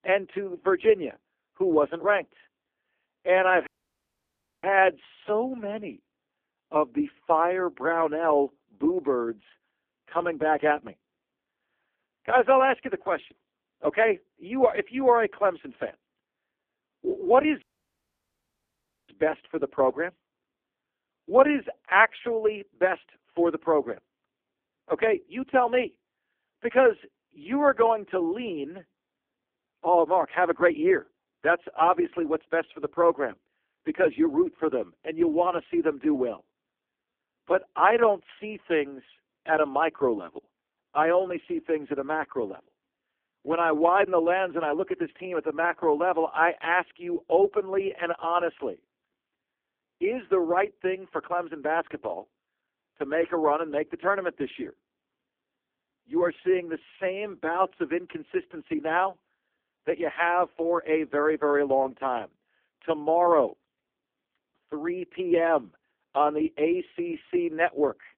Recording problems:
phone-call audio; poor line
audio cutting out; at 3.5 s for 1 s and at 18 s for 1.5 s

